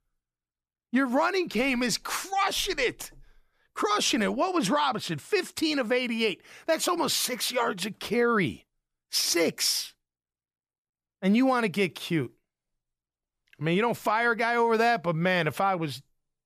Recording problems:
none

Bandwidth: 14.5 kHz